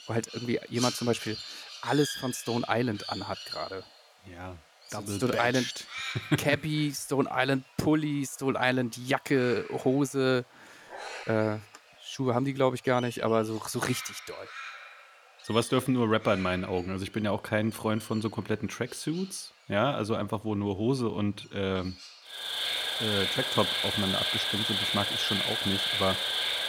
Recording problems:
animal sounds; loud; throughout; 2 dB below the speech
dog barking; faint; at 11 s; peak 15 dB below the speech

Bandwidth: 19 kHz